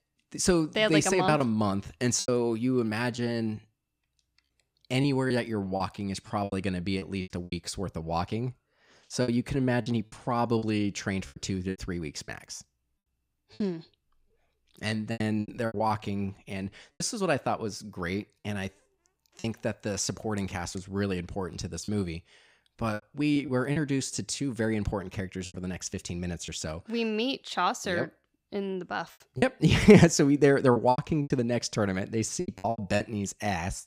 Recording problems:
choppy; very; 8% of the speech affected

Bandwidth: 15.5 kHz